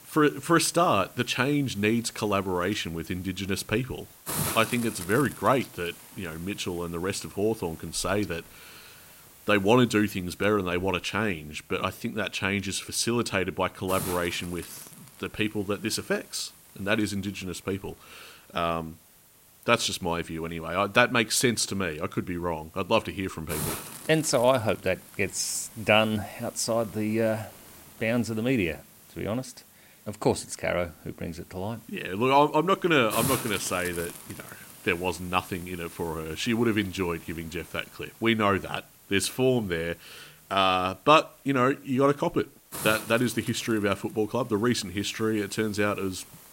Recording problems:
hiss; noticeable; throughout; 15 dB below the speech

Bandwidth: 16 kHz